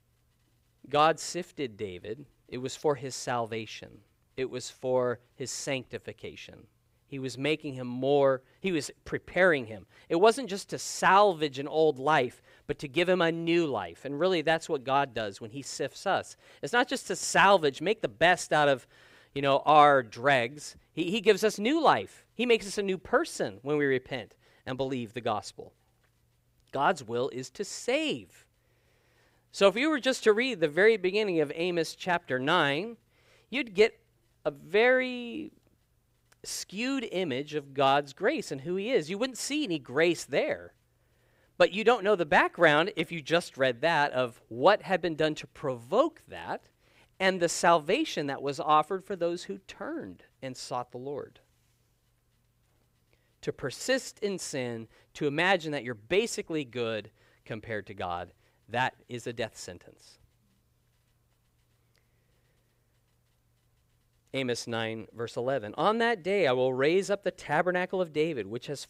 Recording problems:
none

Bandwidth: 15.5 kHz